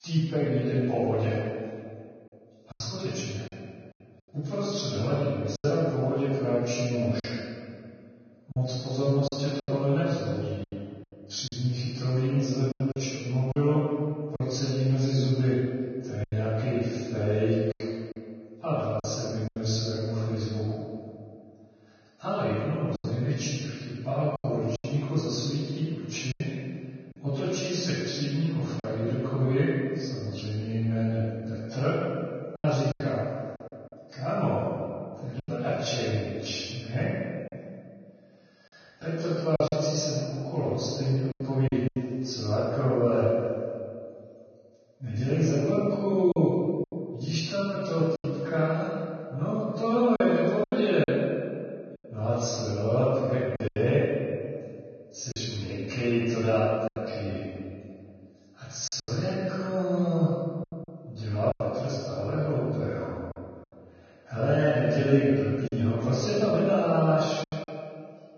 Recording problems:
room echo; strong; dies away in 2 s
off-mic speech; far
garbled, watery; badly; nothing above 6.5 kHz
choppy; very; 5% of the speech affected

